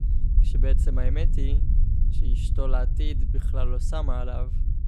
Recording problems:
low rumble; loud; throughout; 8 dB below the speech

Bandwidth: 15 kHz